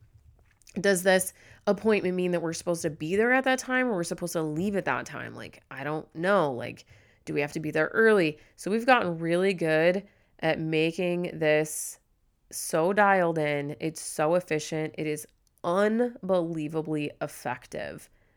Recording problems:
none

